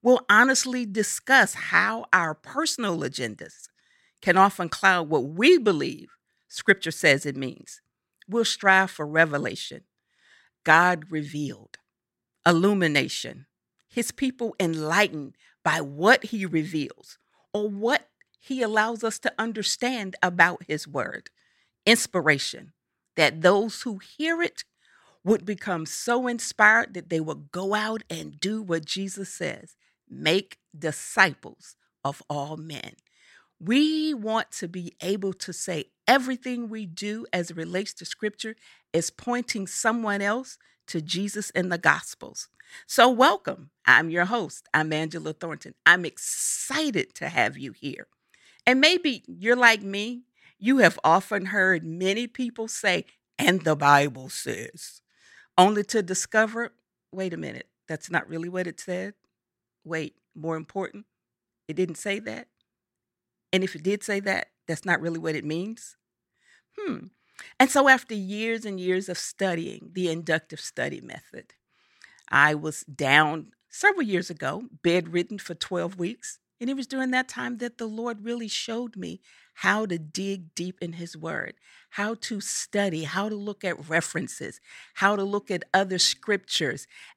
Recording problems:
none

